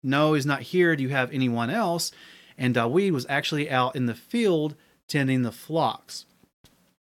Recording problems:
none

